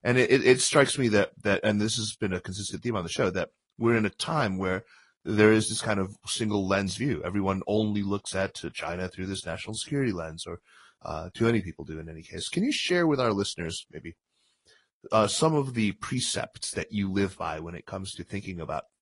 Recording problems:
garbled, watery; slightly; nothing above 10.5 kHz

